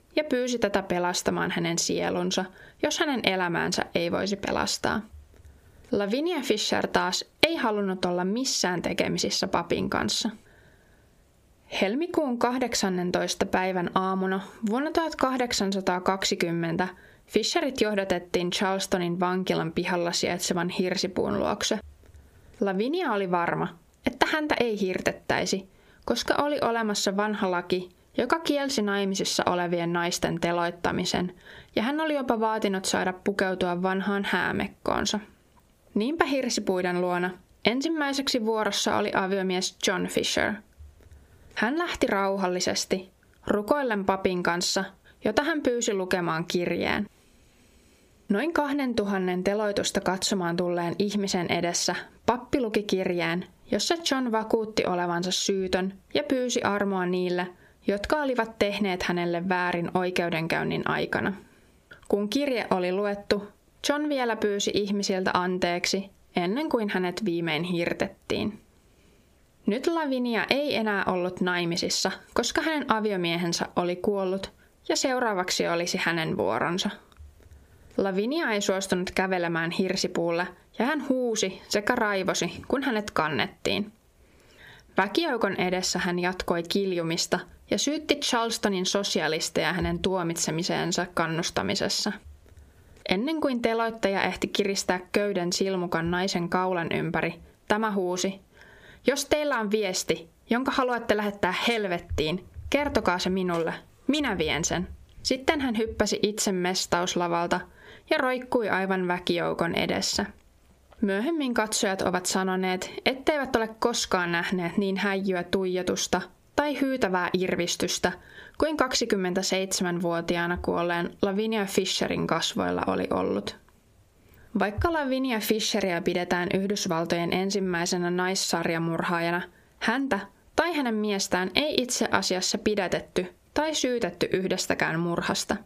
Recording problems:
squashed, flat; heavily

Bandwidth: 15 kHz